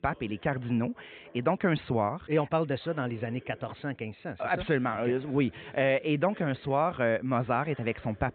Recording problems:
high frequencies cut off; severe; nothing above 4 kHz
voice in the background; faint; throughout; 25 dB below the speech

